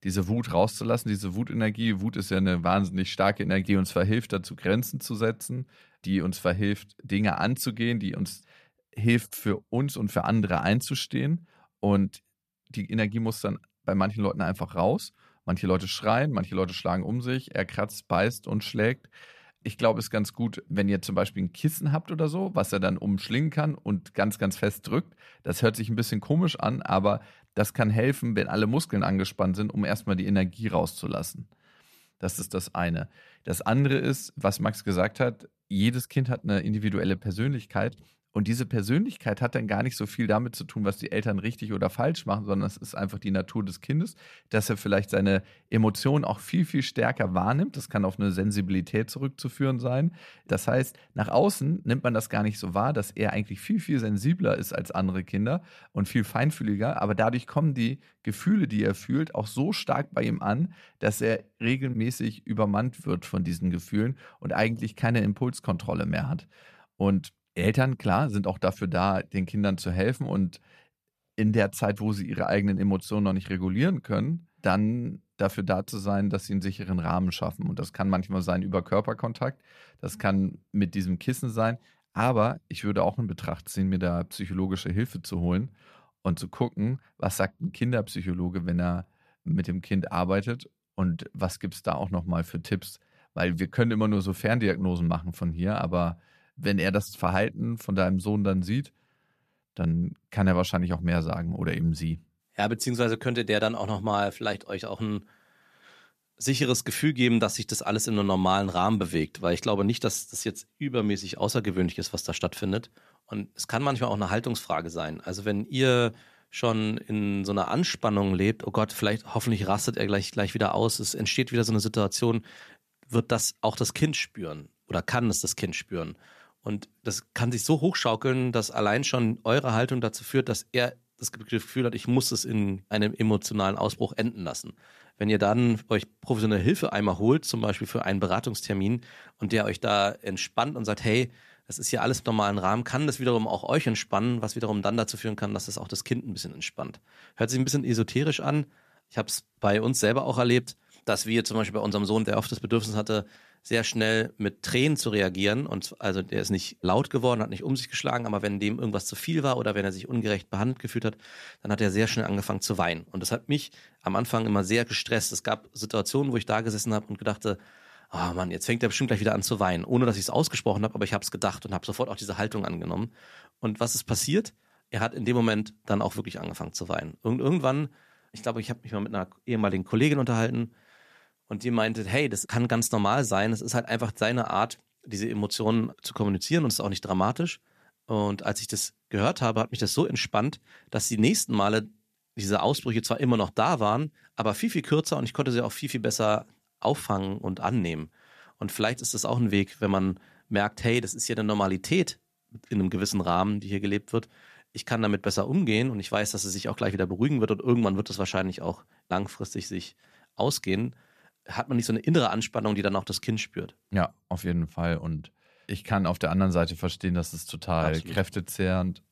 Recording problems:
none

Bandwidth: 14.5 kHz